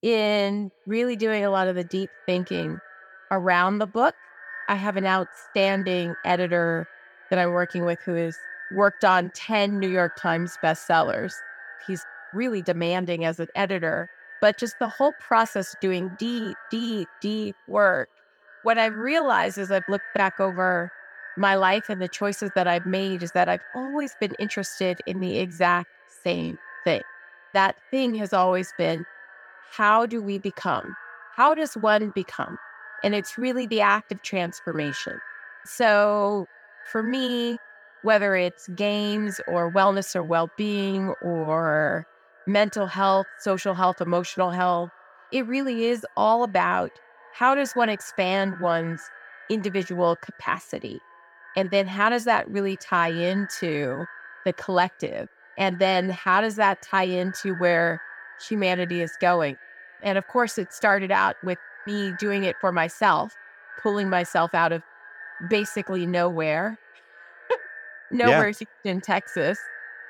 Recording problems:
echo of what is said; noticeable; throughout; 290 ms later, 15 dB below the speech

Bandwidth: 17.5 kHz